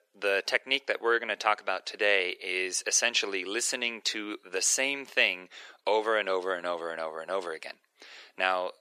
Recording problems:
thin; very; fading below 400 Hz

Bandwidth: 14 kHz